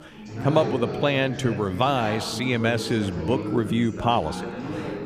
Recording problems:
background chatter; loud; throughout; 4 voices, 7 dB below the speech

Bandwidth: 15 kHz